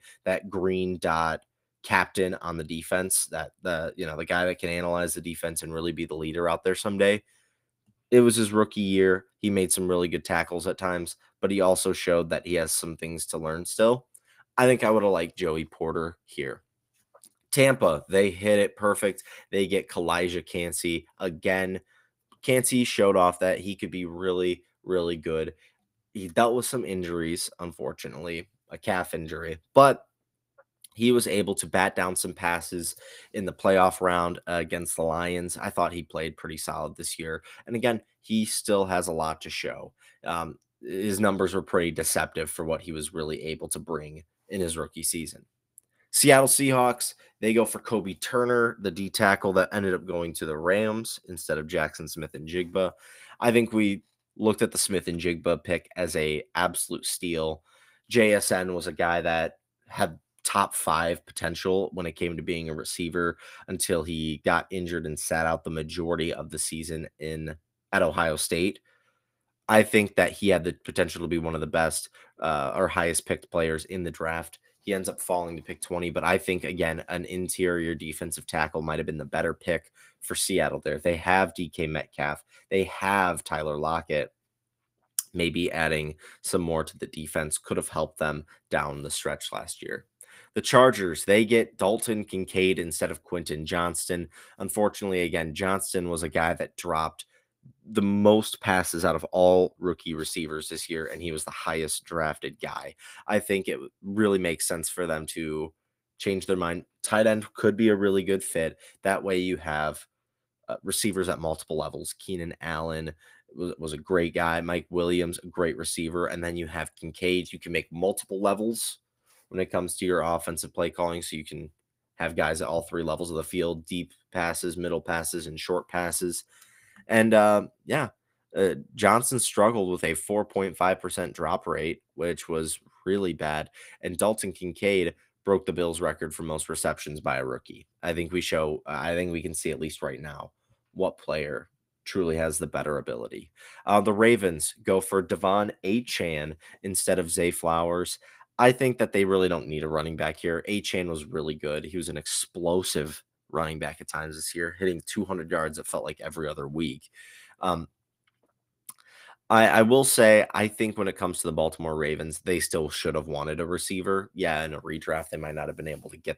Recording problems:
garbled, watery; slightly; nothing above 15.5 kHz

